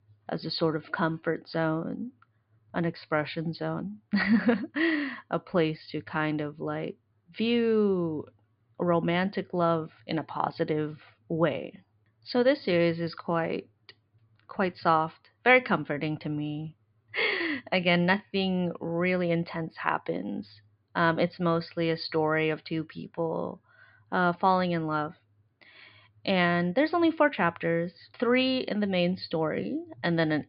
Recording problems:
high frequencies cut off; severe; nothing above 5 kHz

